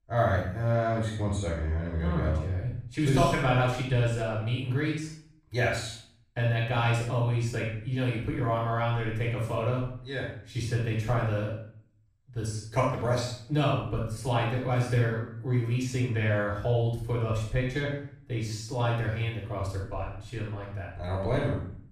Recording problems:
off-mic speech; far
room echo; noticeable; dies away in 0.5 s

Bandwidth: 14.5 kHz